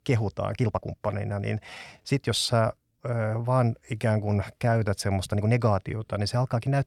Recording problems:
uneven, jittery; strongly; from 0.5 to 6 s

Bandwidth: 18.5 kHz